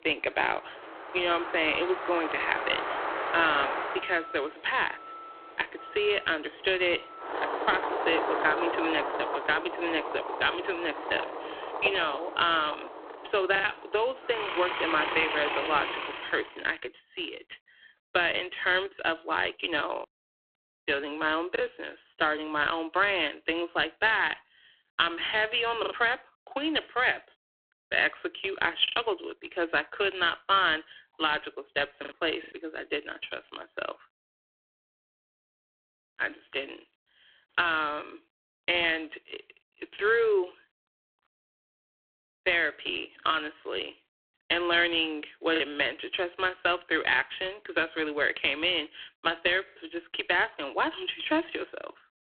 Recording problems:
phone-call audio; poor line
thin; very; fading below 300 Hz
traffic noise; loud; until 16 s; 5 dB below the speech
choppy; occasionally; 2% of the speech affected

